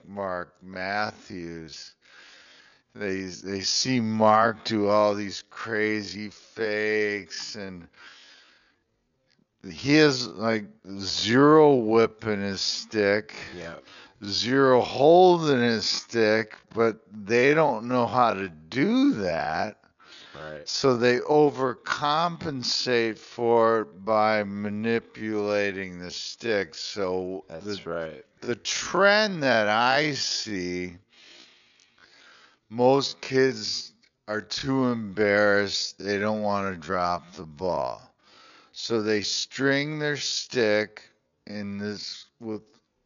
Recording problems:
wrong speed, natural pitch; too slow; 0.5 times normal speed
high frequencies cut off; noticeable; nothing above 7 kHz

